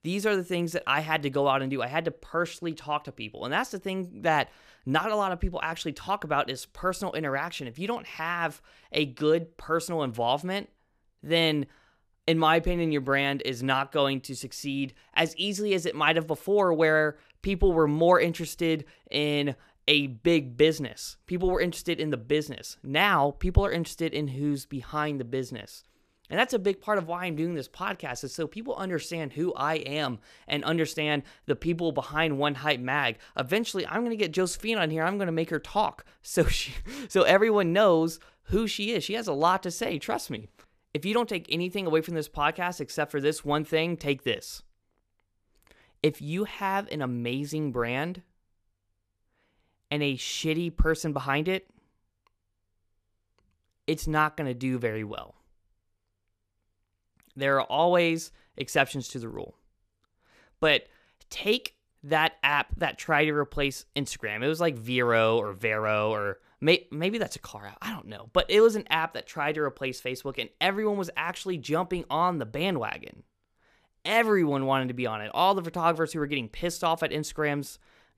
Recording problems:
none

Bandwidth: 14.5 kHz